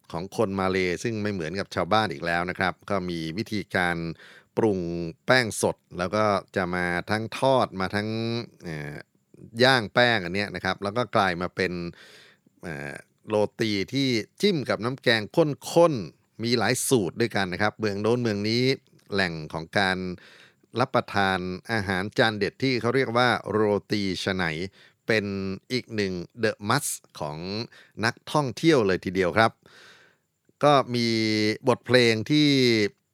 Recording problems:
none

